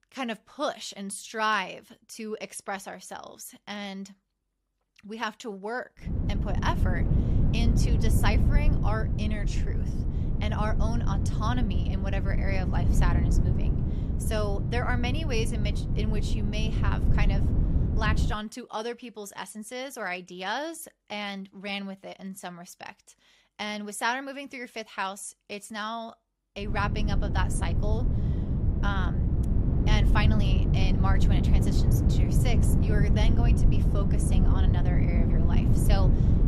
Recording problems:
wind noise on the microphone; heavy; from 6 to 18 s and from 27 s on; 4 dB below the speech

